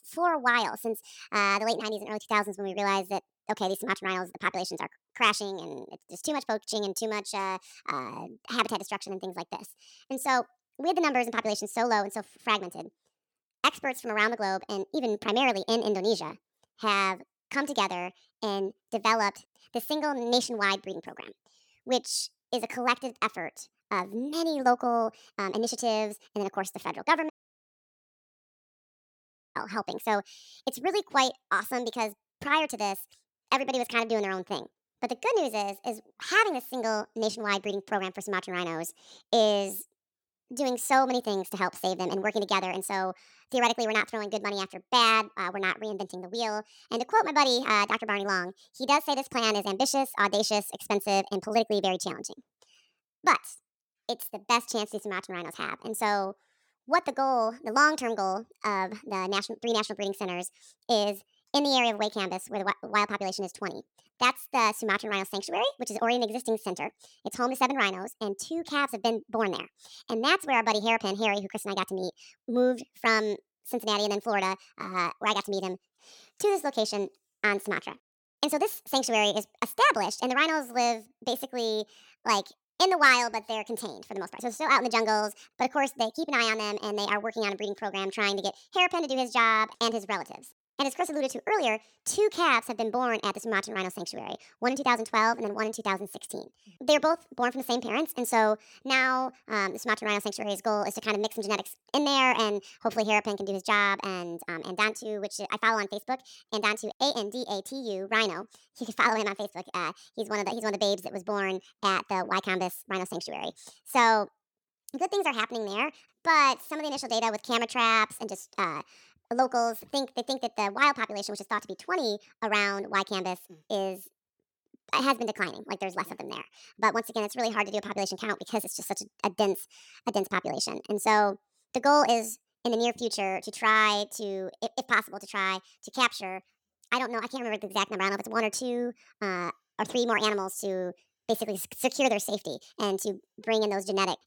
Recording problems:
wrong speed and pitch; too fast and too high; 1.5 times normal speed
audio cutting out; at 27 s for 2.5 s

